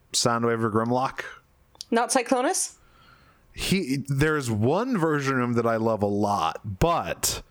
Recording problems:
squashed, flat; heavily

